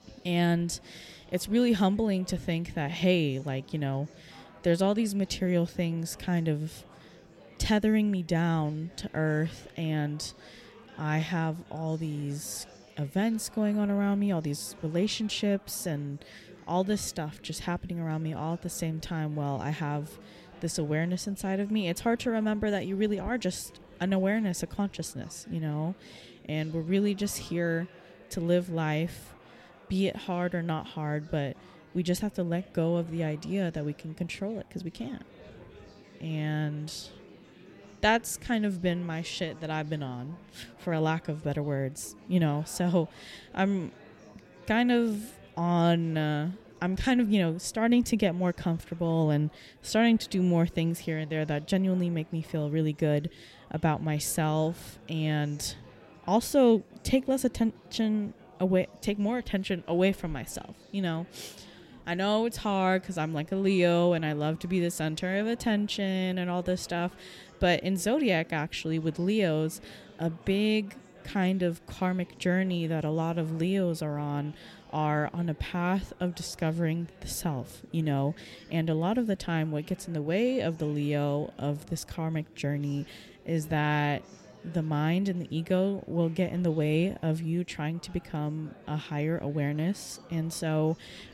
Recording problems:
chatter from many people; faint; throughout; 25 dB below the speech

